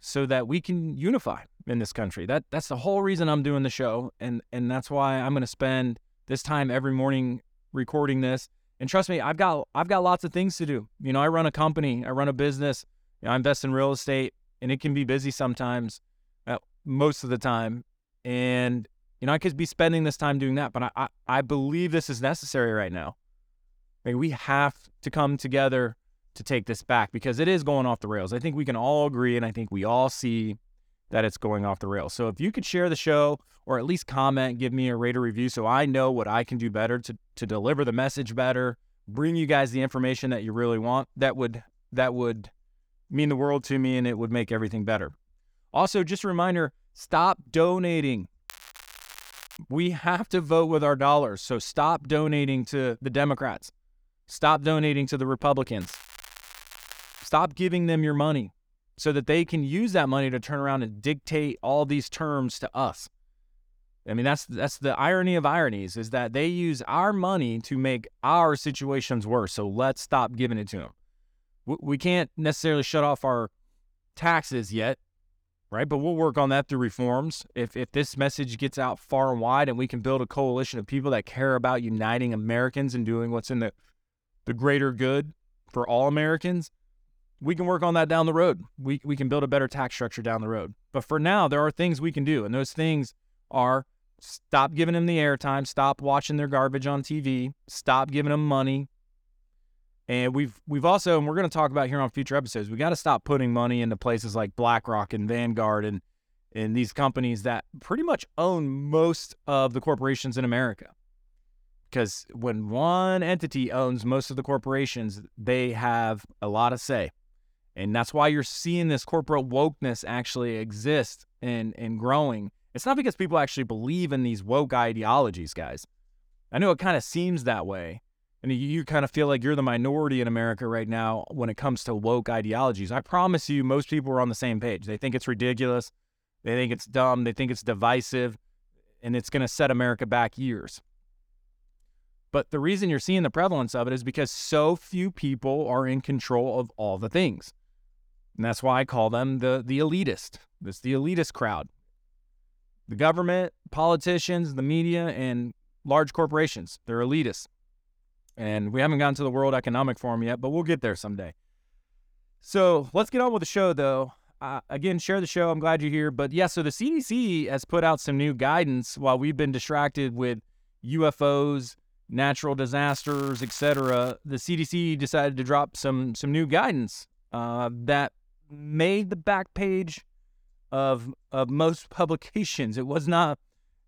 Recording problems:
crackling; noticeable; from 48 to 50 s, from 56 to 57 s and from 2:53 to 2:54; 20 dB below the speech

